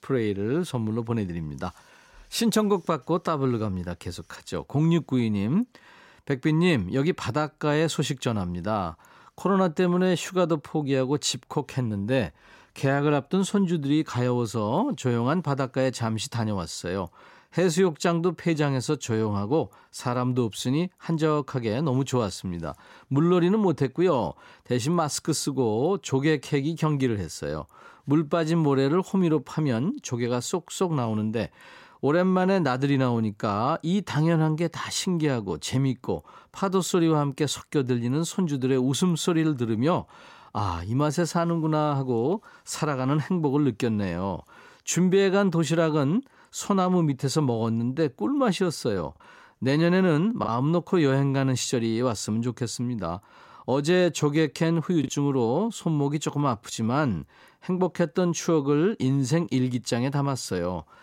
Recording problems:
choppy; occasionally; at 50 s and at 55 s; 1% of the speech affected

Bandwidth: 16 kHz